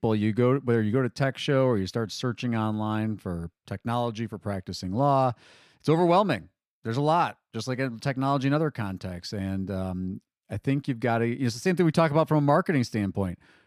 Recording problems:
none

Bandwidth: 14.5 kHz